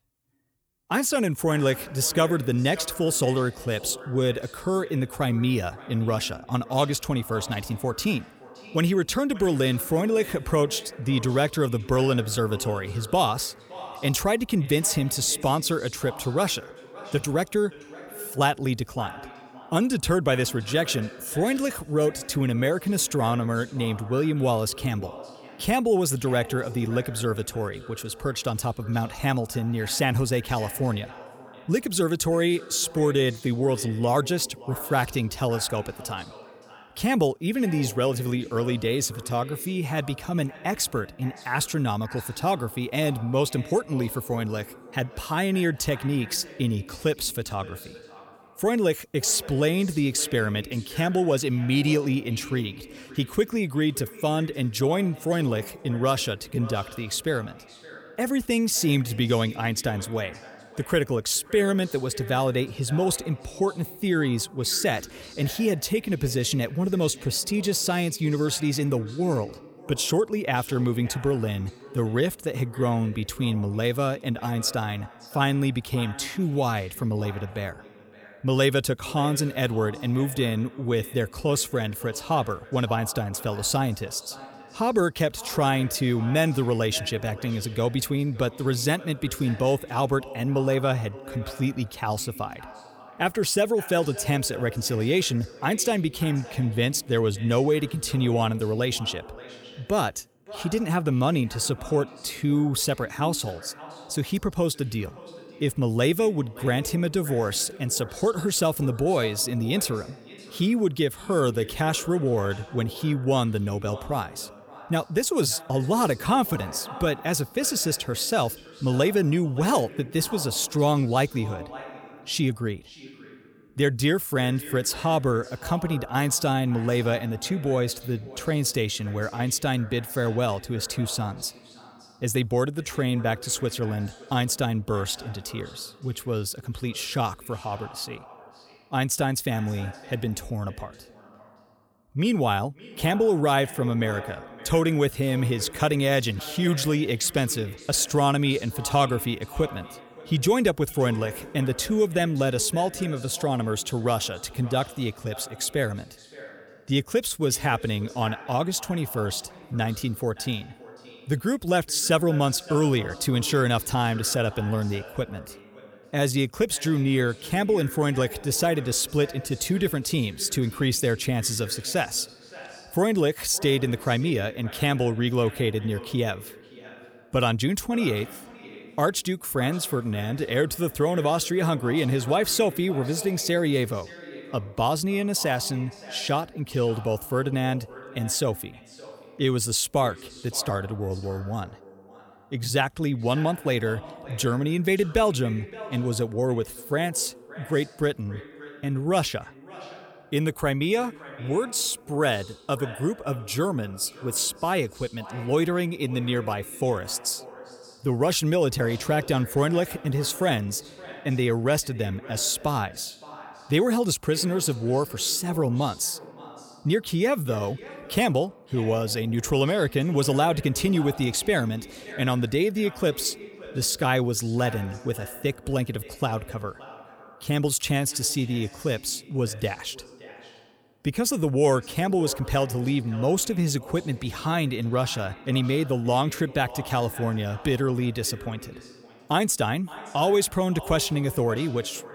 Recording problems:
echo of what is said; noticeable; throughout; 570 ms later, 20 dB below the speech

